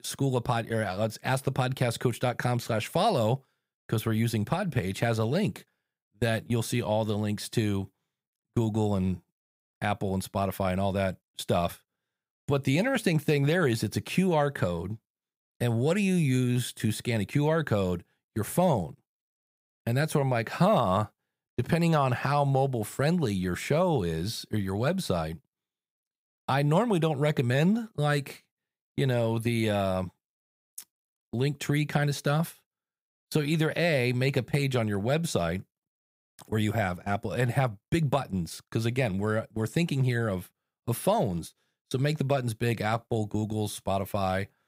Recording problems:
none

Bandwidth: 15.5 kHz